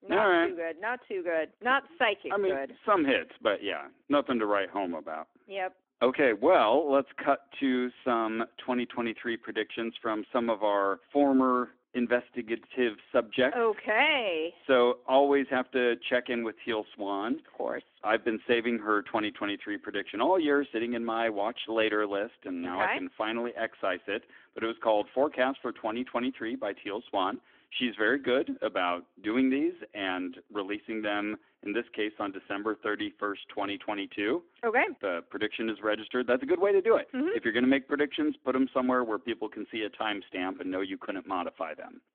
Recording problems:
phone-call audio; nothing above 3.5 kHz

